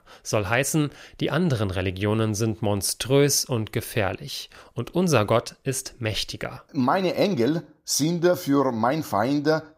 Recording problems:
none

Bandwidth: 15.5 kHz